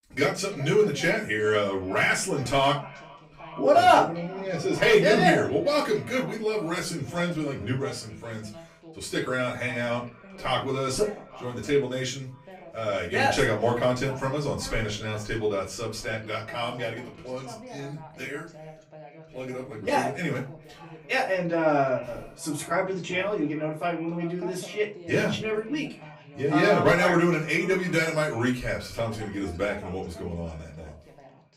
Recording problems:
off-mic speech; far
echo of what is said; faint; throughout; 420 ms later, 25 dB below the speech
room echo; slight; dies away in 0.3 s
voice in the background; faint; throughout; 20 dB below the speech

